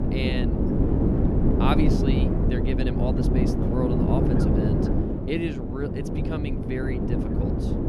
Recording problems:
wind noise on the microphone; heavy; 3 dB above the speech

